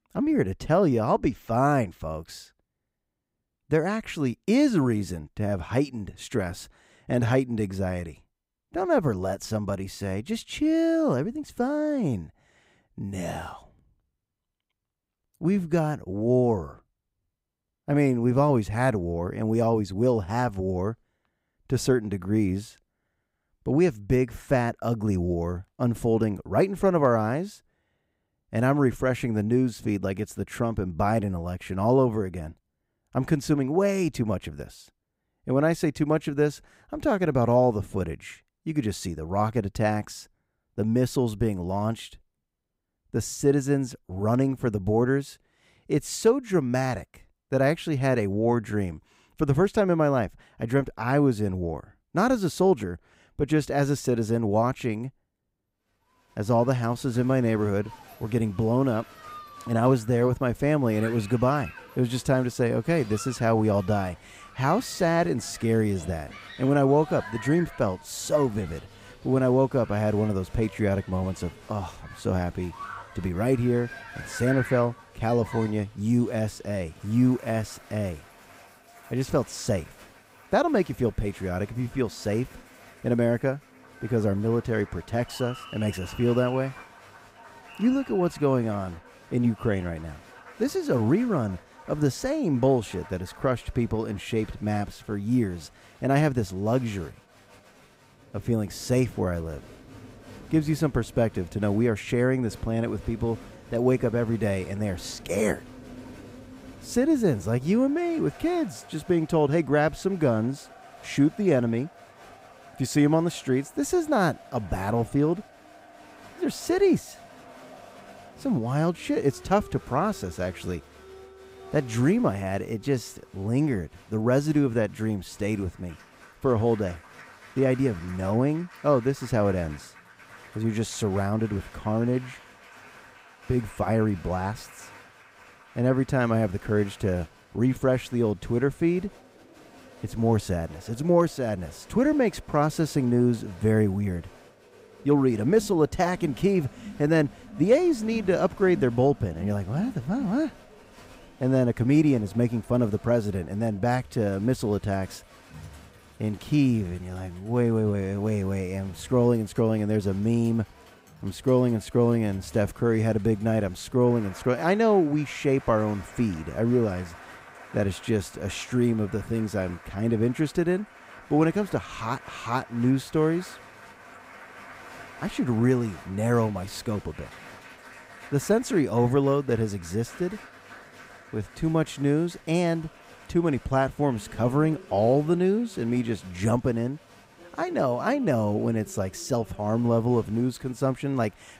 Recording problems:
crowd noise; faint; from 57 s on; 20 dB below the speech

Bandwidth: 15.5 kHz